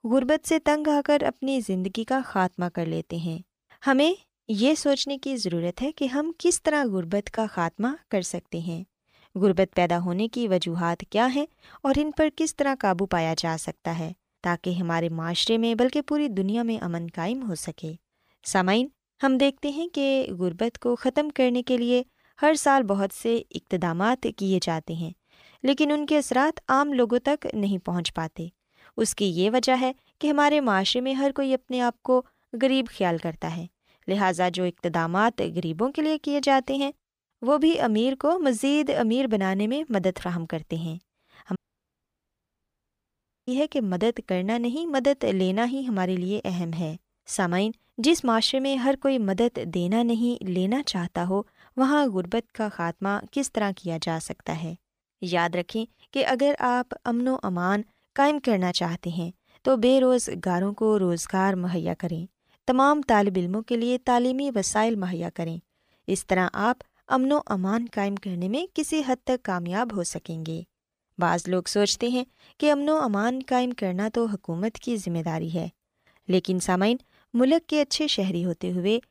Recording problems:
audio cutting out; at 42 s for 2 s

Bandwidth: 15 kHz